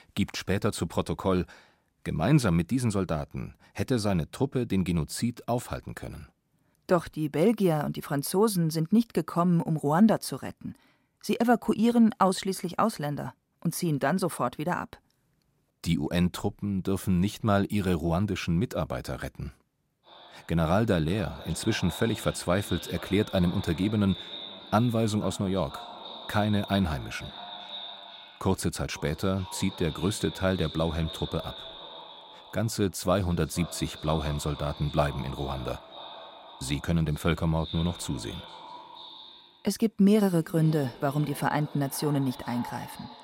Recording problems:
echo of what is said; noticeable; from 20 s on; 480 ms later, 15 dB below the speech

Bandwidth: 16 kHz